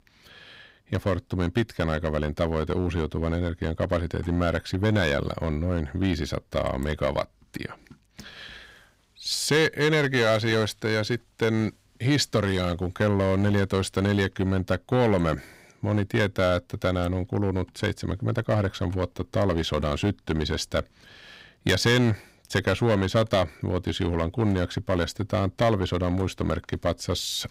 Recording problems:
distortion; slight; 4% of the sound clipped

